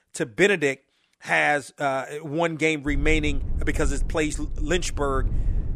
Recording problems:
low rumble; faint; from 3 s on; 25 dB below the speech

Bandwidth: 15 kHz